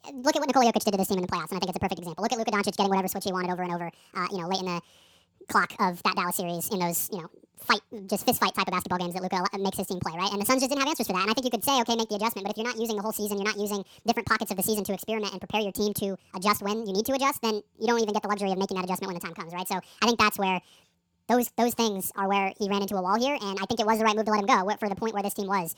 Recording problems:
wrong speed and pitch; too fast and too high; 1.7 times normal speed

